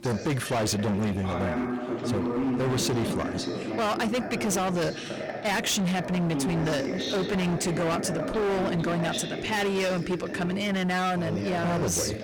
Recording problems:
distortion; heavy; 27% of the sound clipped
voice in the background; loud; throughout; 5 dB below the speech

